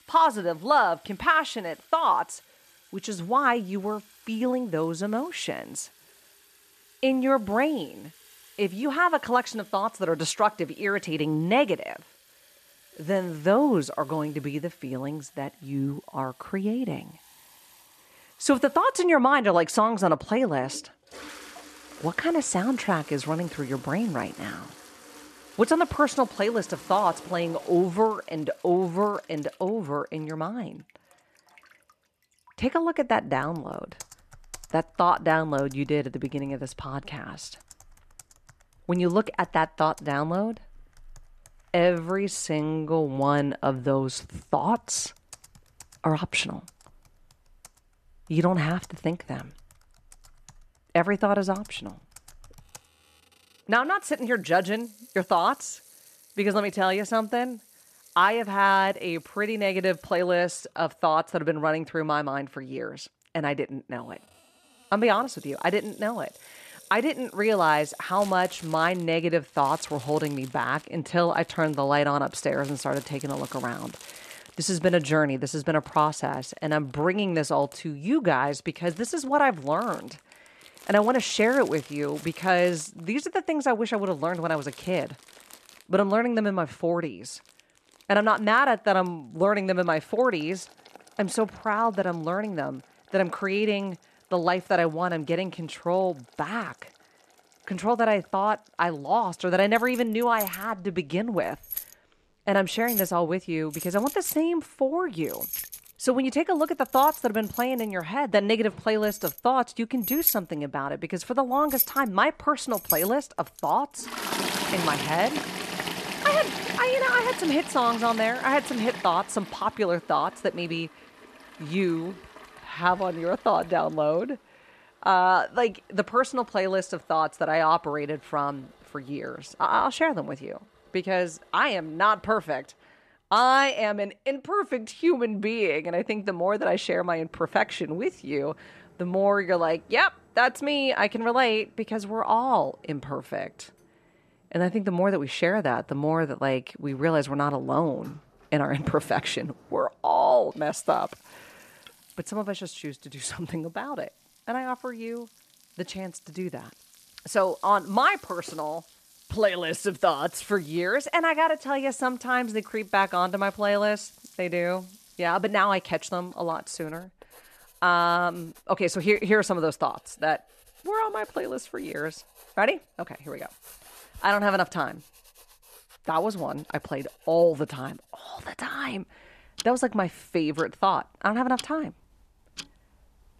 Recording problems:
household noises; noticeable; throughout; 10 dB below the speech

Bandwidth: 14 kHz